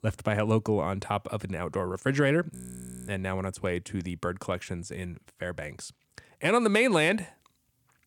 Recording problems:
audio freezing; at 2.5 s for 0.5 s

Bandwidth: 18 kHz